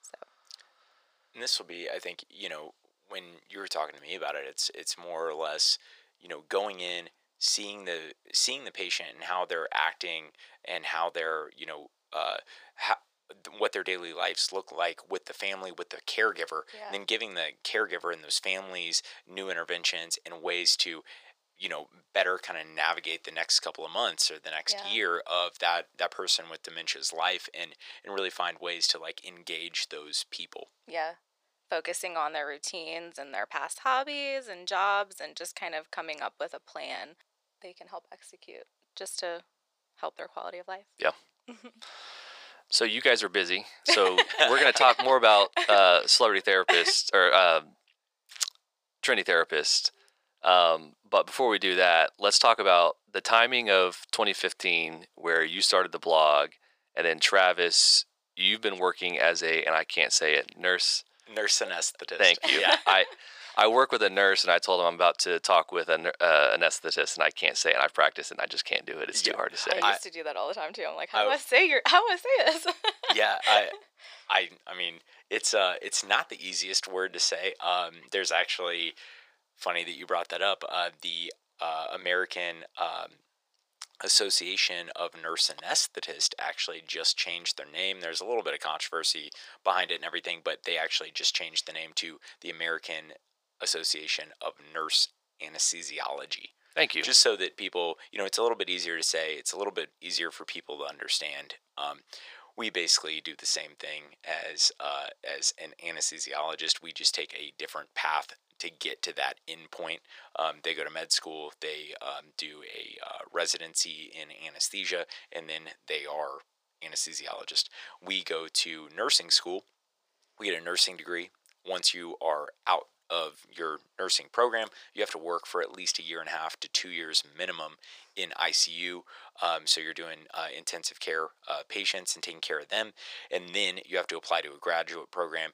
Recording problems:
thin; very; fading below 550 Hz

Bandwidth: 15 kHz